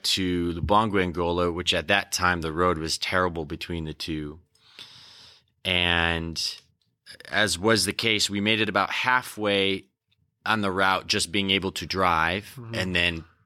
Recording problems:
none

